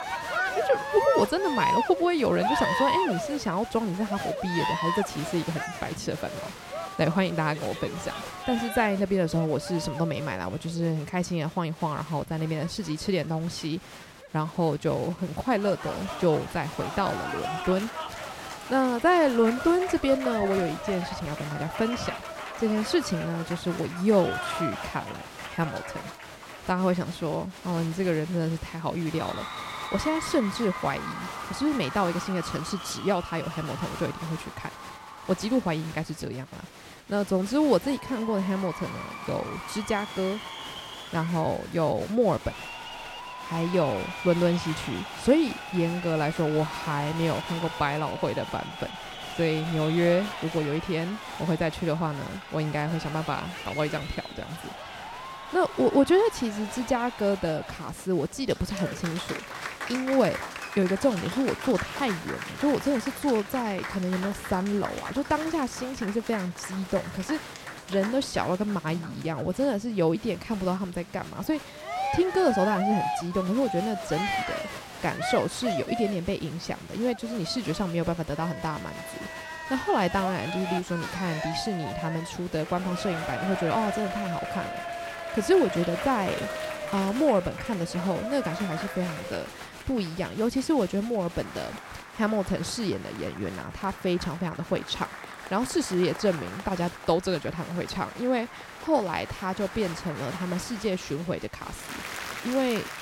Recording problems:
crowd noise; loud; throughout; 7 dB below the speech

